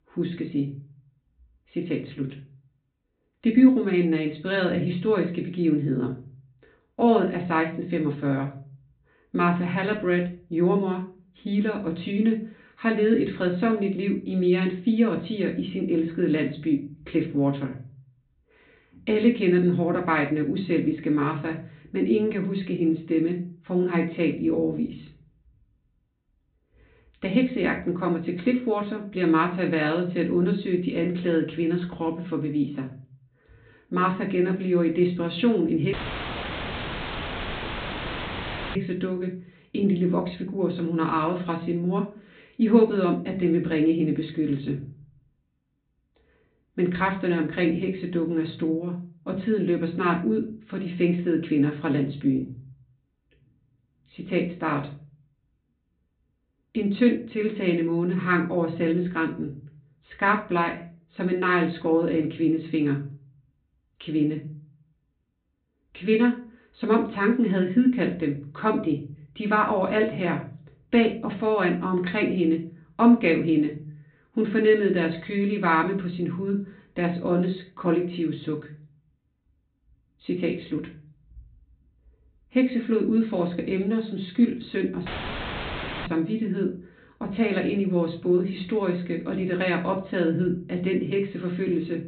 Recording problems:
off-mic speech; far
high frequencies cut off; severe; nothing above 4 kHz
room echo; very slight; dies away in 0.4 s
audio cutting out; filled with static; at 36 s for 3 s and at 1:25 for 1 s

